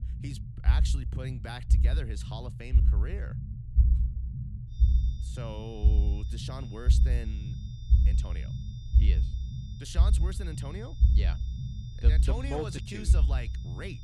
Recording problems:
low rumble; loud; throughout; 5 dB below the speech
high-pitched whine; noticeable; from 4.5 s on; 3.5 kHz, 15 dB below the speech

